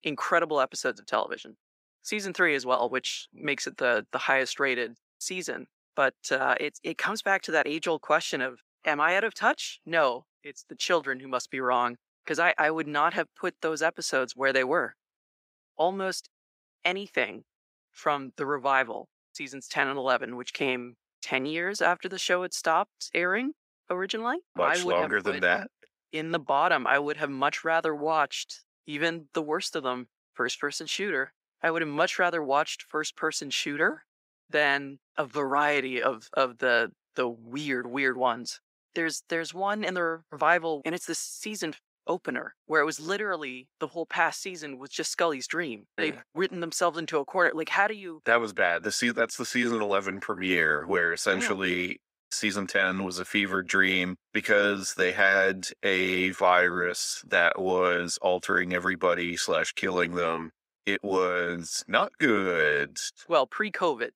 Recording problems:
thin; somewhat; fading below 400 Hz

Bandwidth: 15.5 kHz